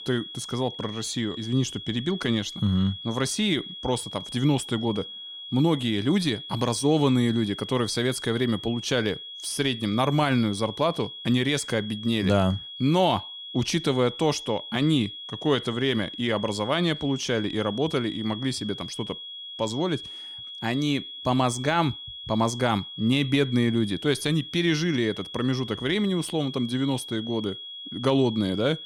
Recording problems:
high-pitched whine; noticeable; throughout; 3.5 kHz, 10 dB below the speech

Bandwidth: 18.5 kHz